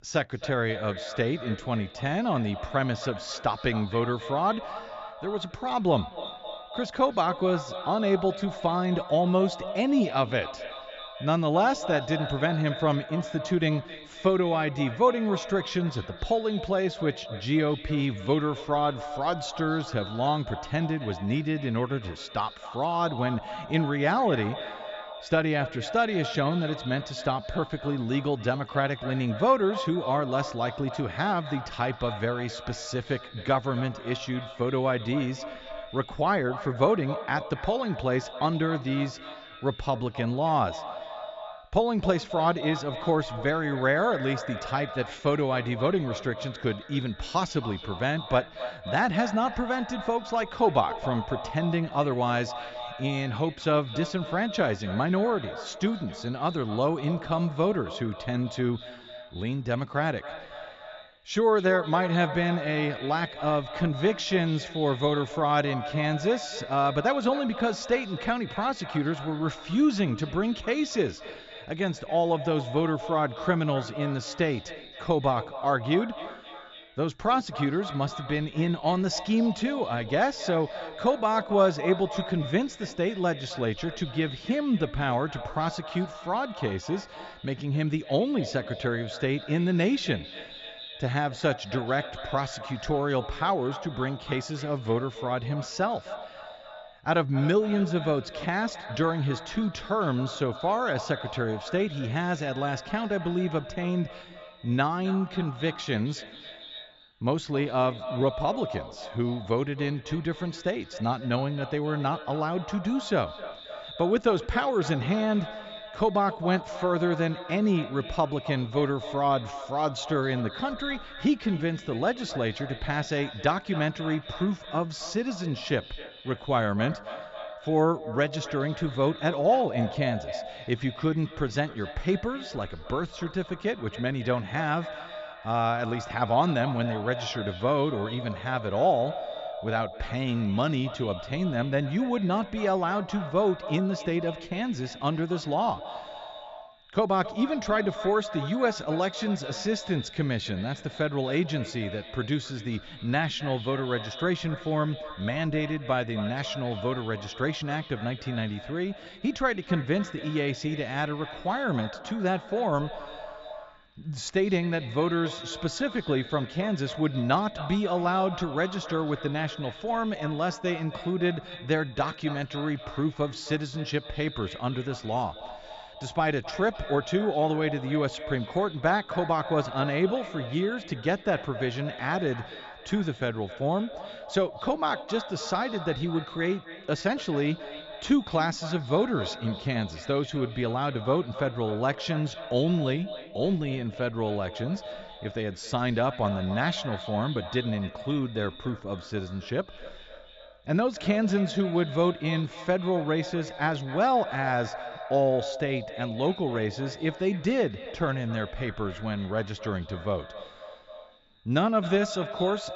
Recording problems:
echo of what is said; strong; throughout; 260 ms later, 10 dB below the speech
high frequencies cut off; noticeable; nothing above 8 kHz

